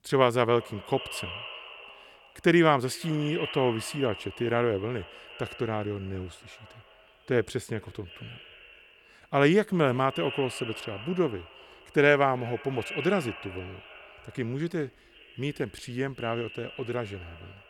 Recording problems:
echo of what is said; noticeable; throughout; 360 ms later, 15 dB below the speech

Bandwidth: 17 kHz